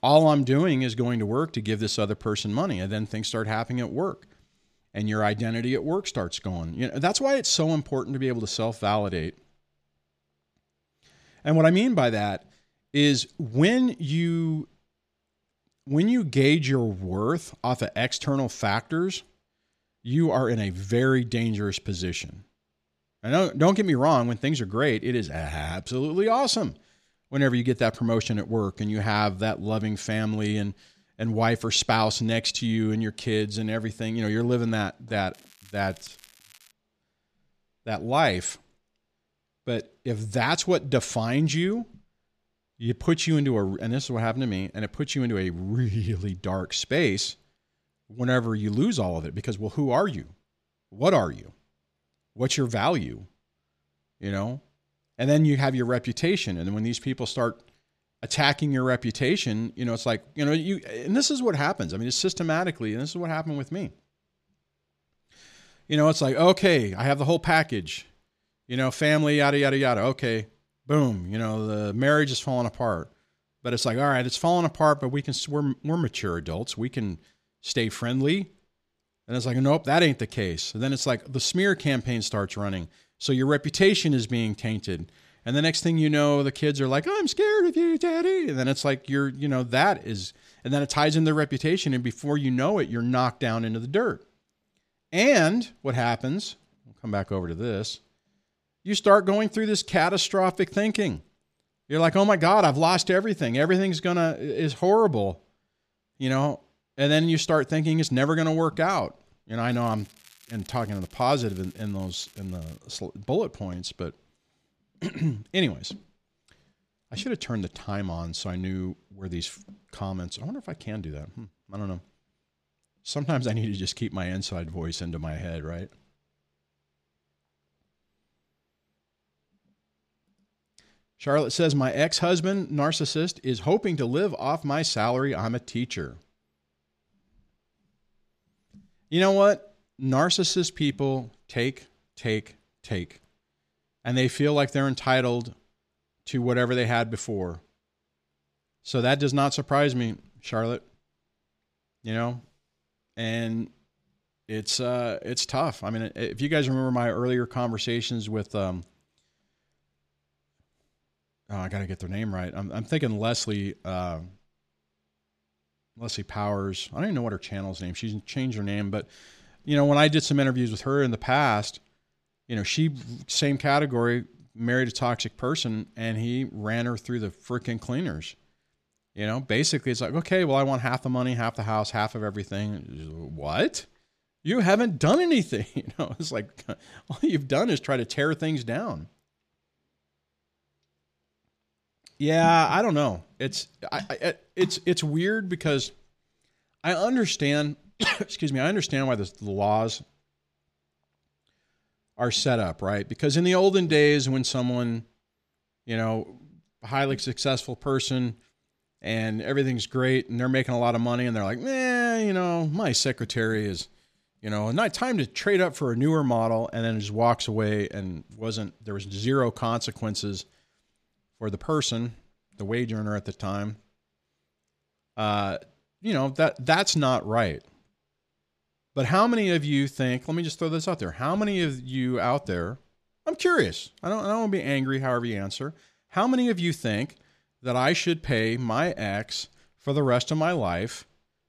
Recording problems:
crackling; faint; from 35 to 37 s and from 1:50 to 1:53; 25 dB below the speech

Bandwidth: 14.5 kHz